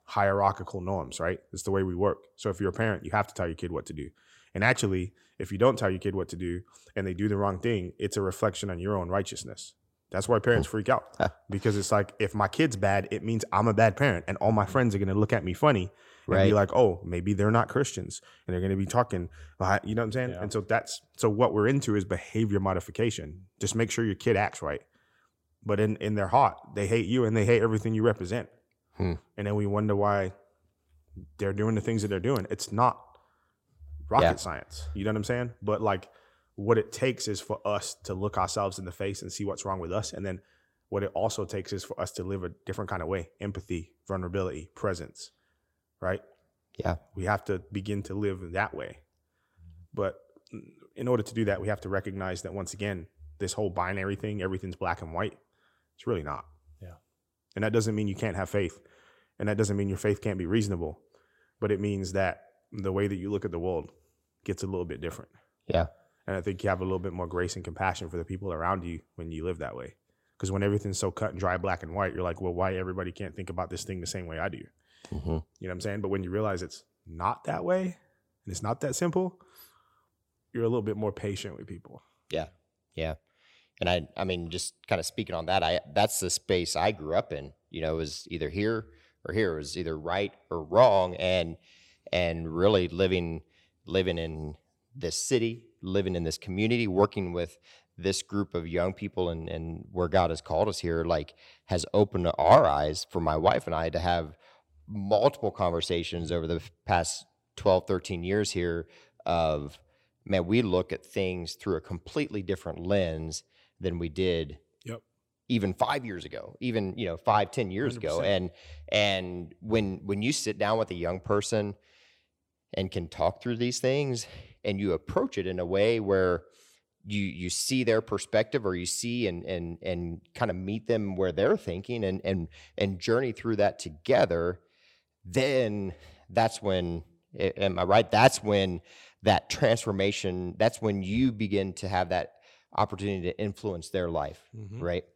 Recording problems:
none

